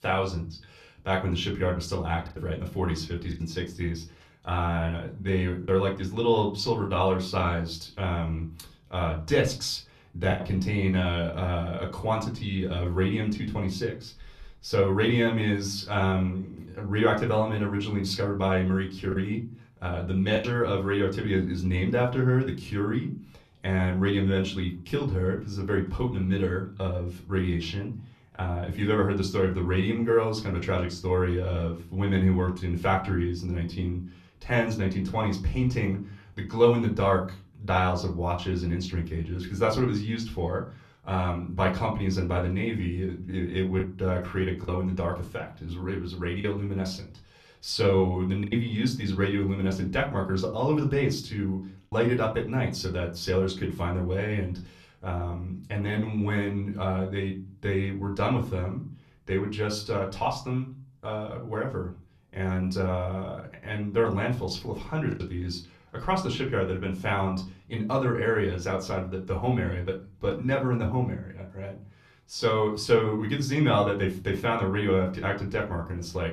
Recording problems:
off-mic speech; far
room echo; very slight; dies away in 0.3 s
choppy; occasionally; 1% of the speech affected

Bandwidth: 13.5 kHz